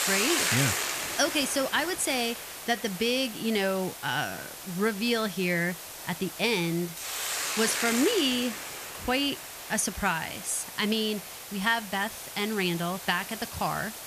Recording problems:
hiss; loud; throughout; 5 dB below the speech

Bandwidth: 14.5 kHz